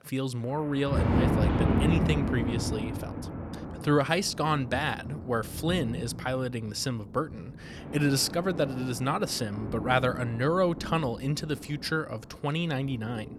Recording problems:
rain or running water; loud; throughout; 3 dB below the speech

